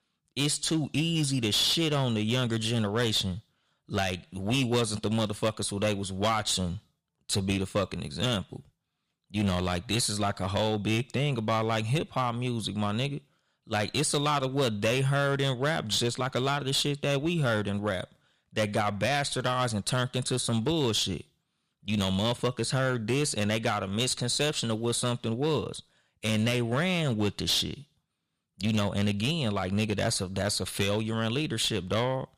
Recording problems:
distortion; slight; 6% of the sound clipped

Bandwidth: 15 kHz